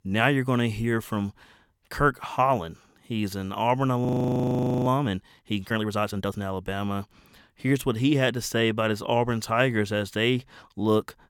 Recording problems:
audio freezing; at 4 s for 1 s

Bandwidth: 17.5 kHz